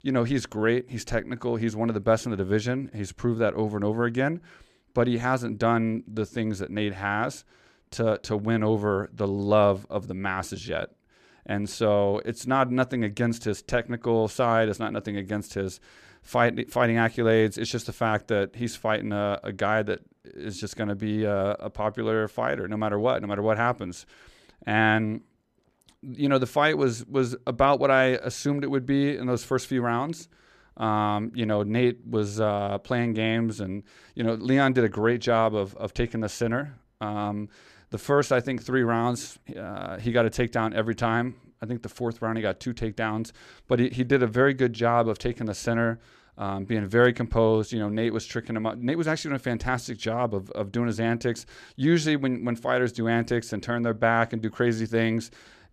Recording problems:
none

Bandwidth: 14.5 kHz